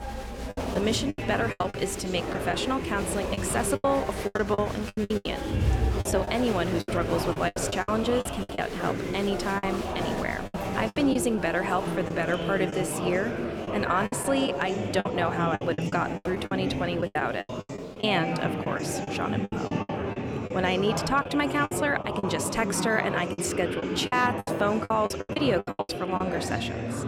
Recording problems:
chatter from many people; loud; throughout; 3 dB below the speech
choppy; very; 12% of the speech affected

